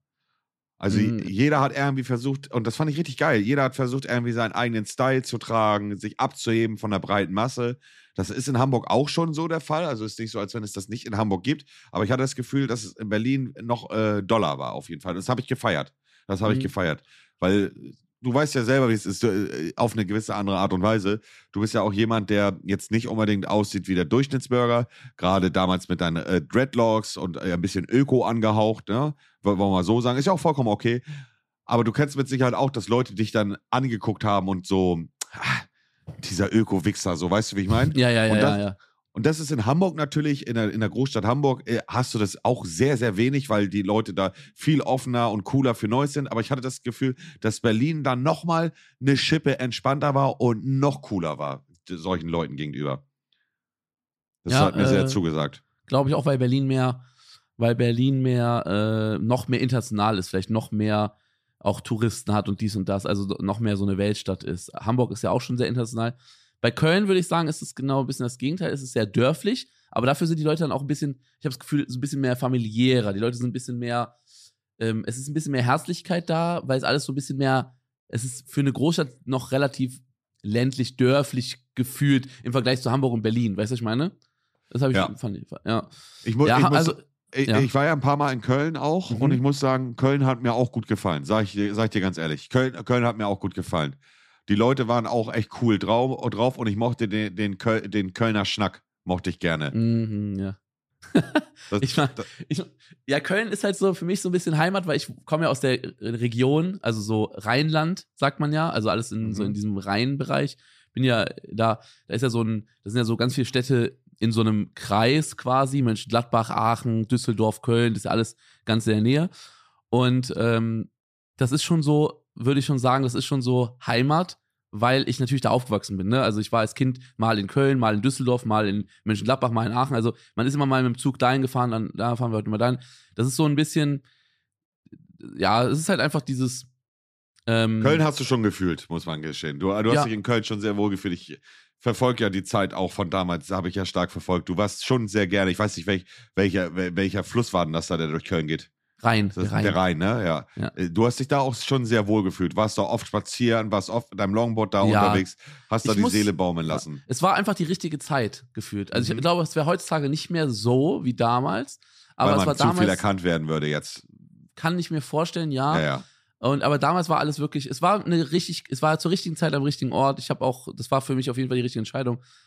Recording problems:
none

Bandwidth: 14.5 kHz